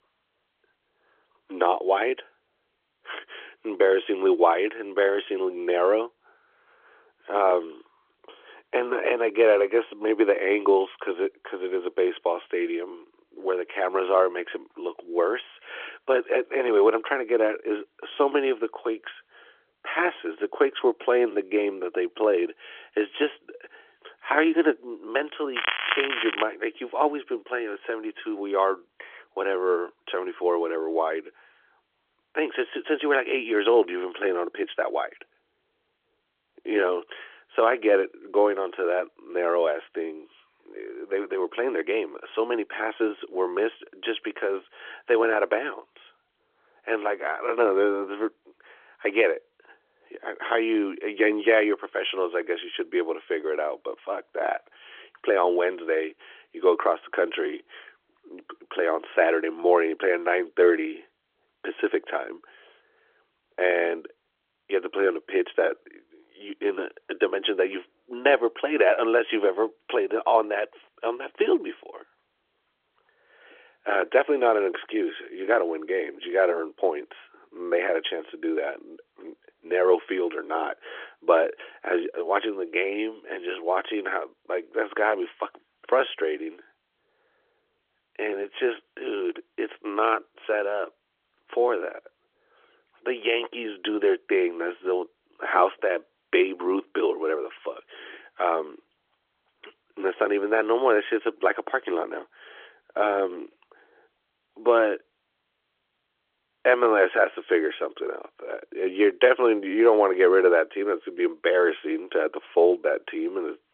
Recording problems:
phone-call audio; nothing above 3.5 kHz
crackling; loud; at 26 s; 2 dB below the speech

